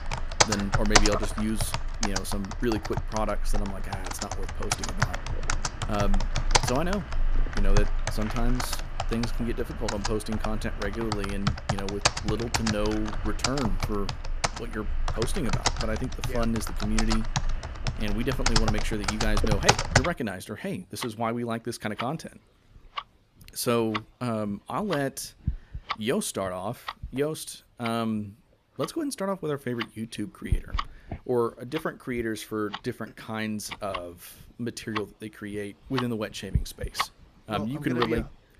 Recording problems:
household noises; very loud; throughout; 1 dB above the speech

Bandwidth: 14.5 kHz